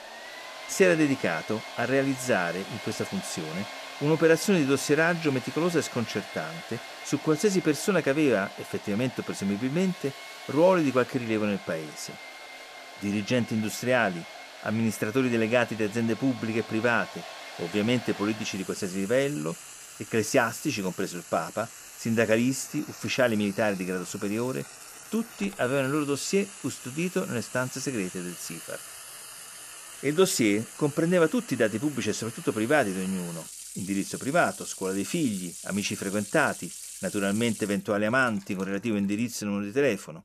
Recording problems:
household noises; noticeable; throughout; 15 dB below the speech

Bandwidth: 14.5 kHz